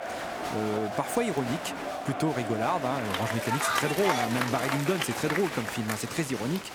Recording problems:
crowd noise; loud; throughout; 2 dB below the speech

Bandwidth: 18.5 kHz